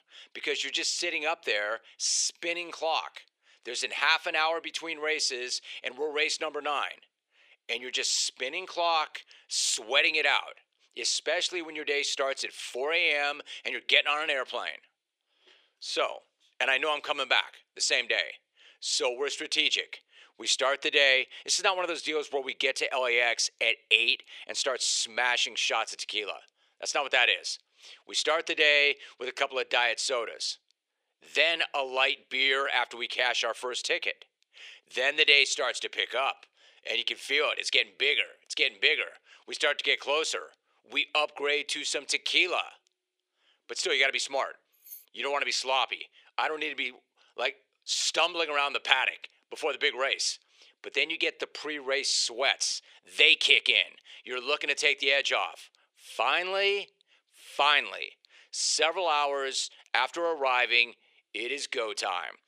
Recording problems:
thin; very; fading below 400 Hz
jangling keys; faint; at 45 s; peak 20 dB below the speech

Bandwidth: 15 kHz